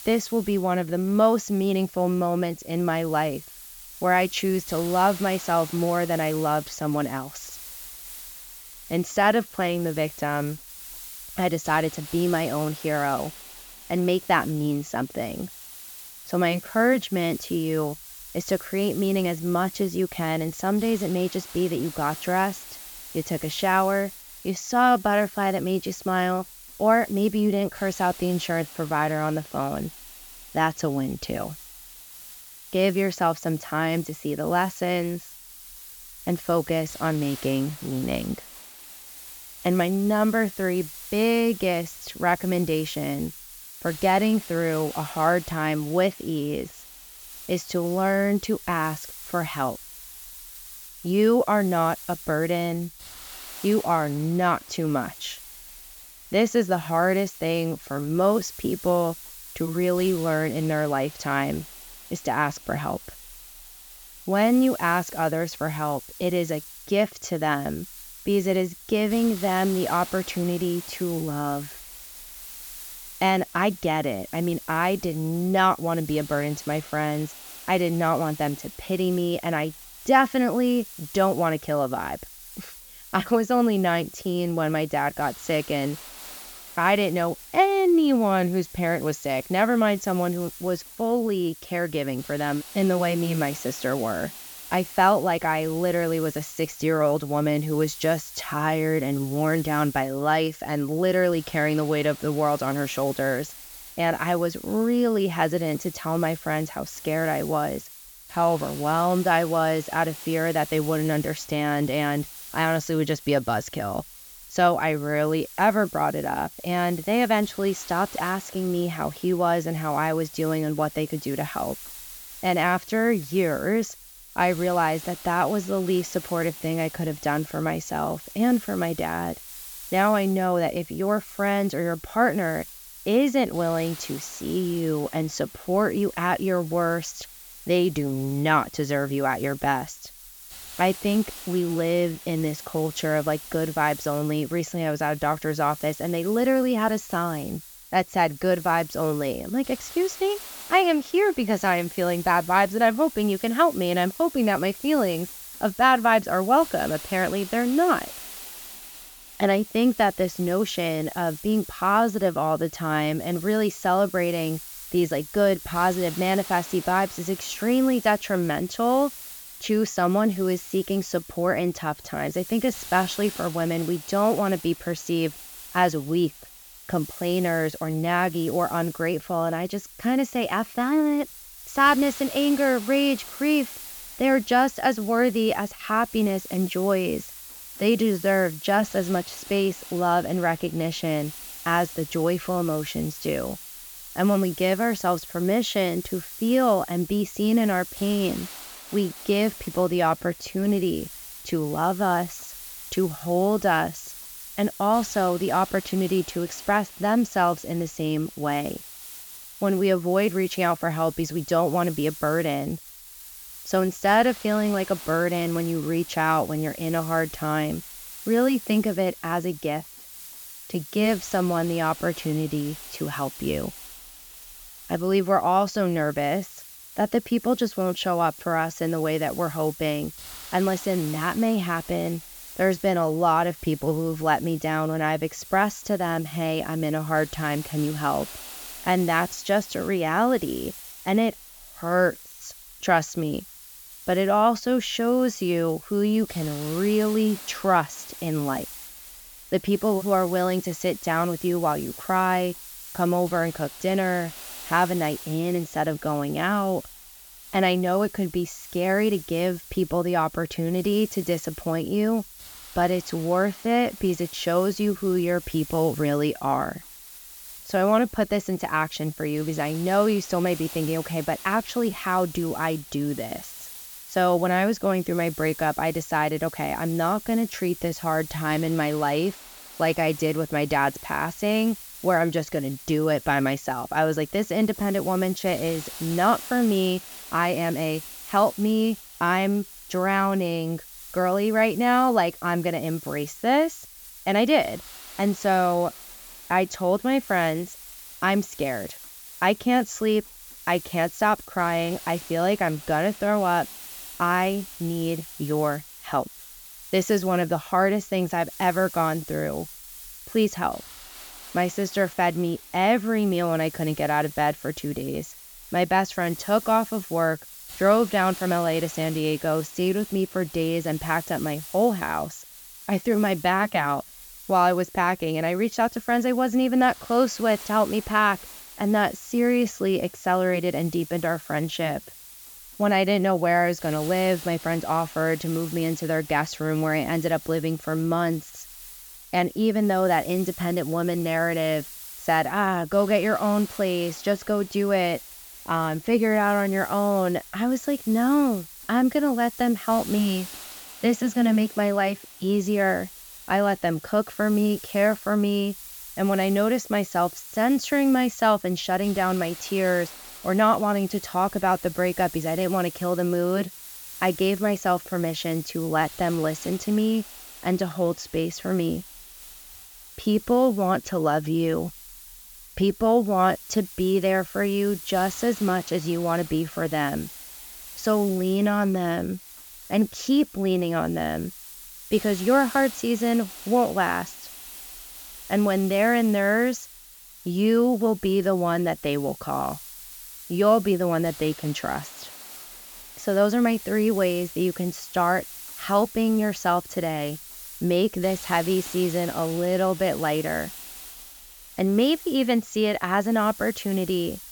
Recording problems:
high frequencies cut off; noticeable; nothing above 8 kHz
hiss; noticeable; throughout; 15 dB below the speech

